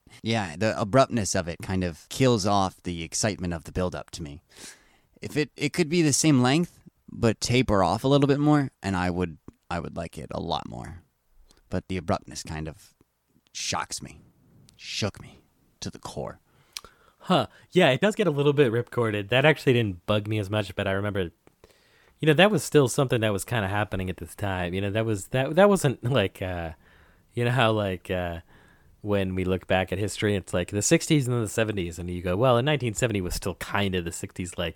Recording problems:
uneven, jittery; strongly; from 5 to 21 s

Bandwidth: 17.5 kHz